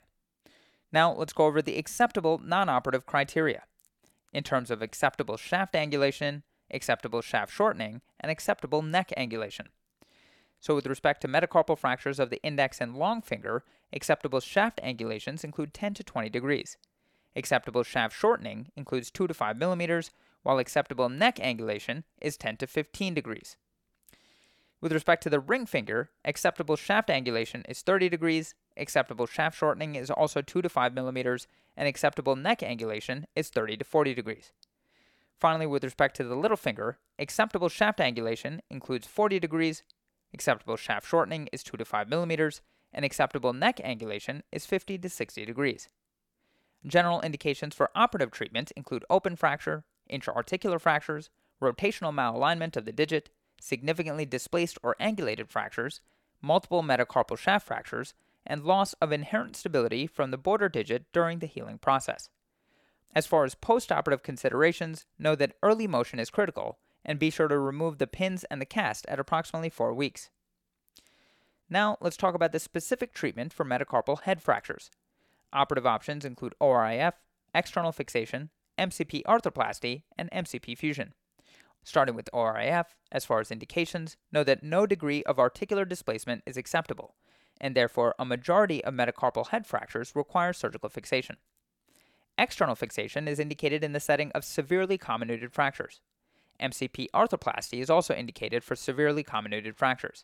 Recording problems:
none

